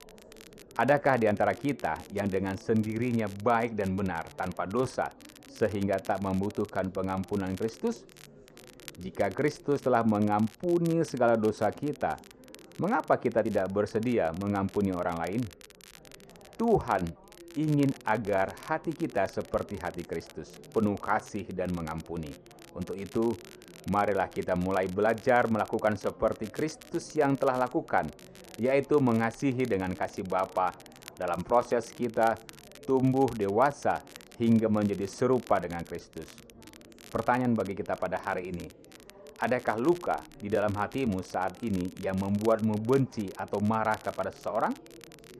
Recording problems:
muffled; slightly; fading above 1.5 kHz
chatter from many people; faint; throughout; 25 dB below the speech
crackle, like an old record; faint; 25 dB below the speech

